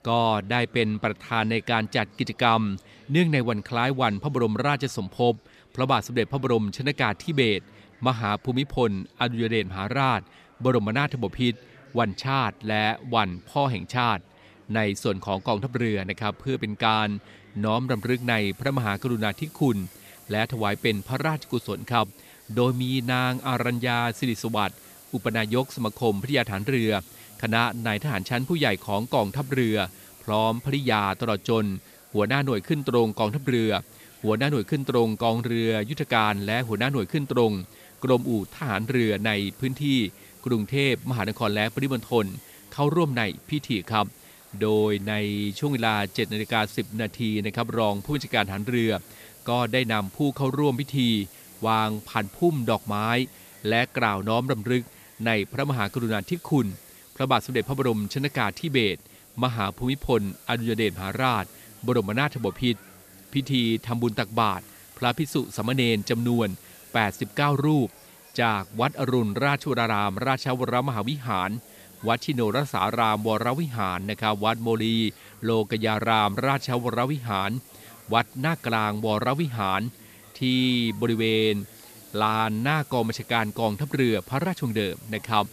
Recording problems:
murmuring crowd; faint; throughout; 30 dB below the speech
hiss; faint; from 18 s on; 20 dB below the speech

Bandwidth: 14.5 kHz